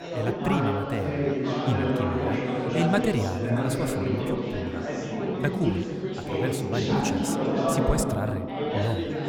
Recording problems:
chatter from many people; very loud; throughout; 3 dB above the speech

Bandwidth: 18.5 kHz